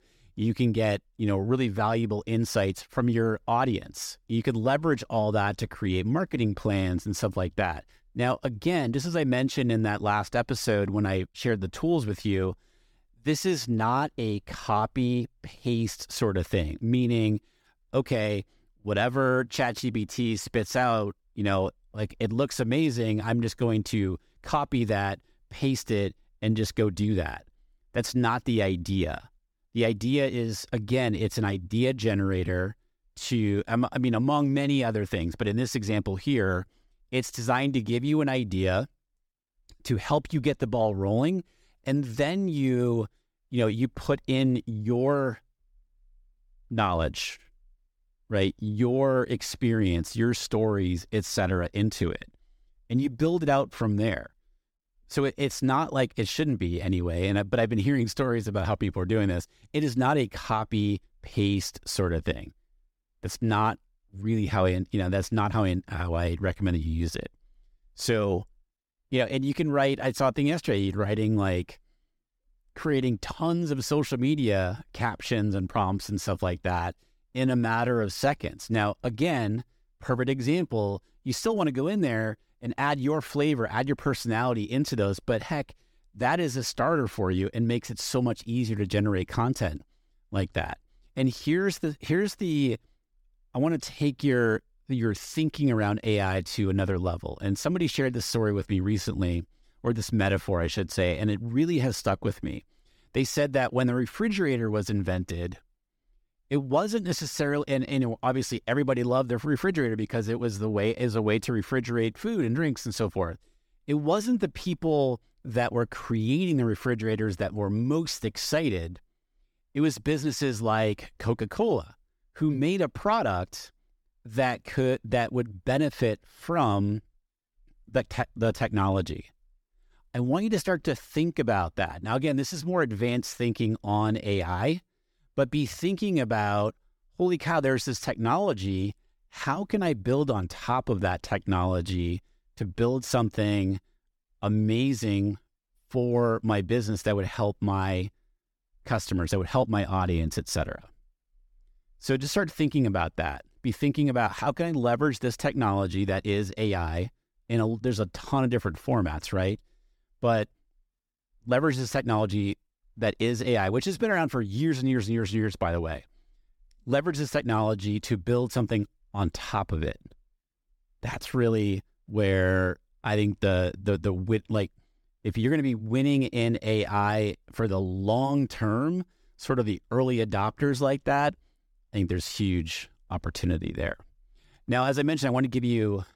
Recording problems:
none

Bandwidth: 17.5 kHz